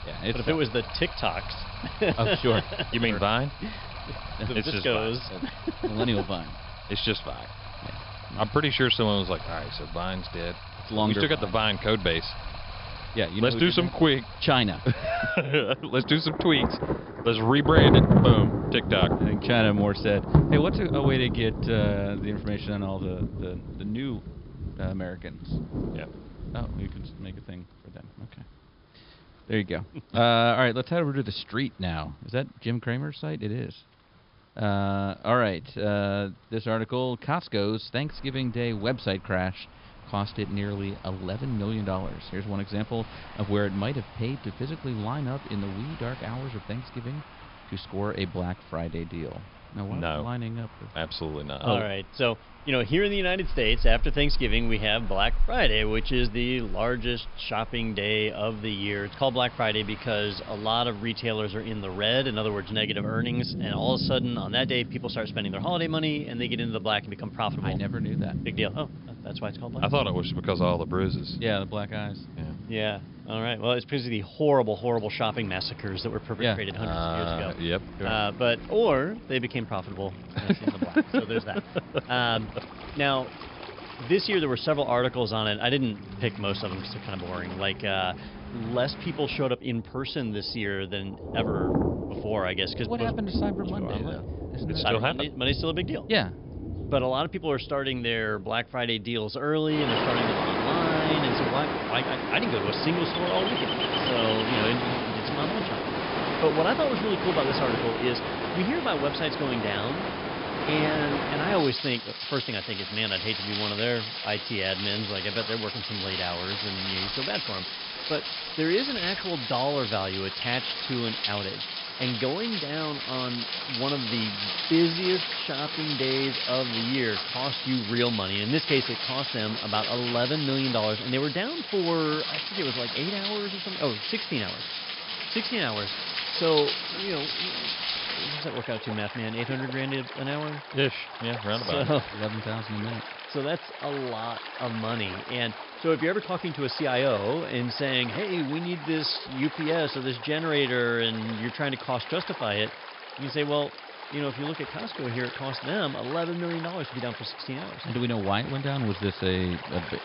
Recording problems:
high frequencies cut off; noticeable; nothing above 5.5 kHz
rain or running water; loud; throughout; 4 dB below the speech

